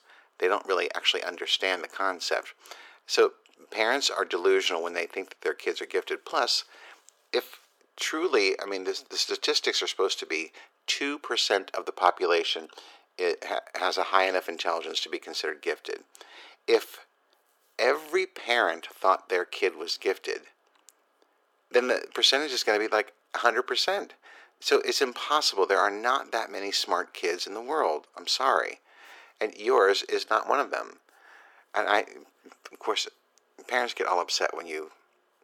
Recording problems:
thin; very; fading below 400 Hz

